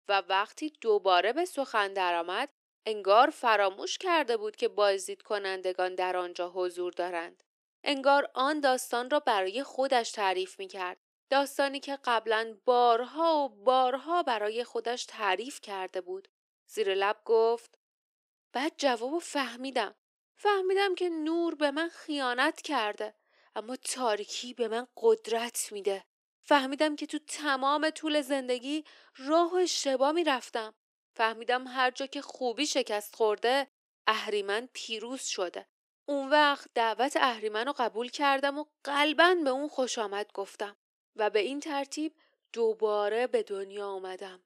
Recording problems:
thin; somewhat; fading below 350 Hz

